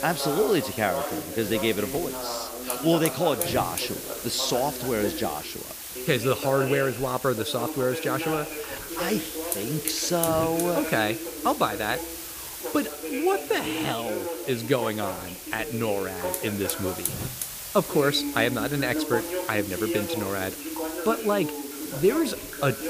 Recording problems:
voice in the background; loud; throughout; 7 dB below the speech
hiss; loud; throughout; 7 dB below the speech

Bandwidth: 15 kHz